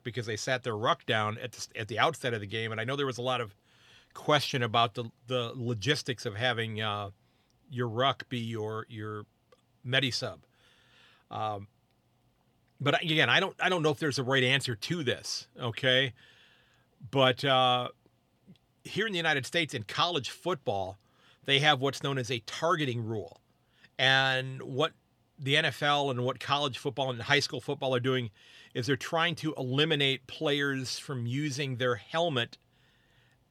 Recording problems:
none

